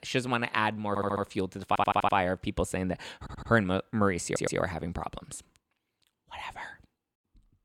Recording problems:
audio stuttering; 4 times, first at 1 s

